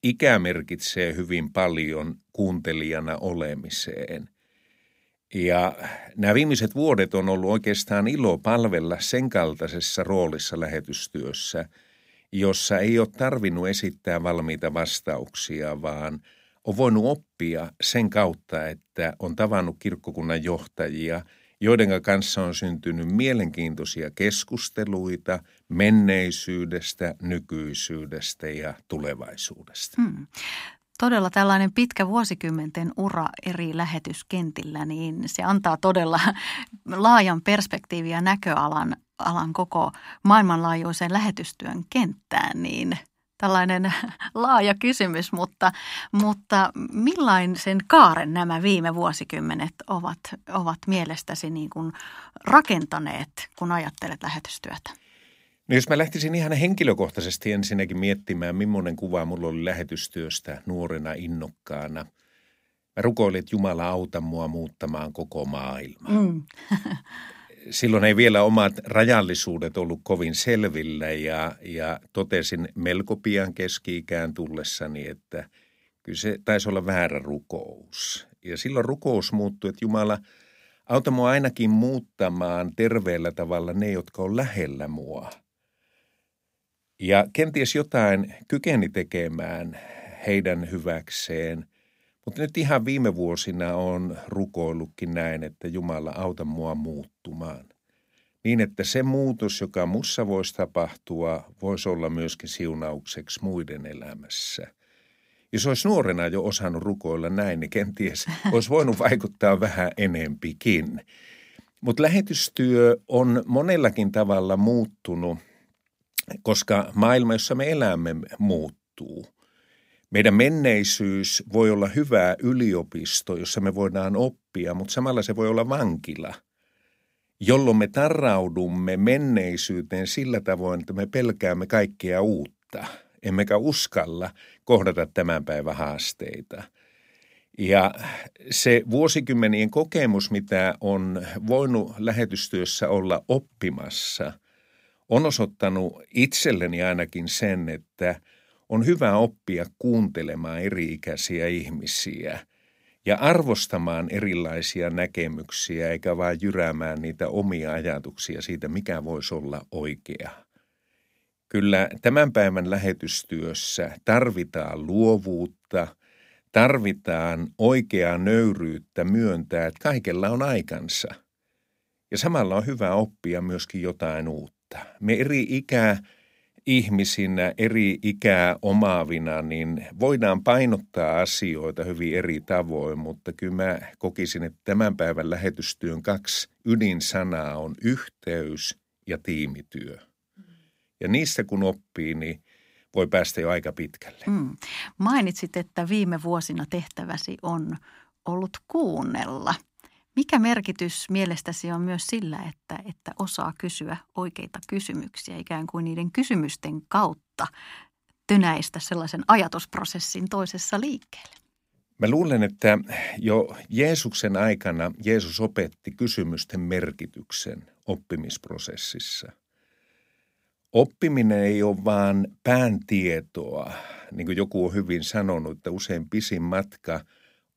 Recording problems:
none

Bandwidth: 15.5 kHz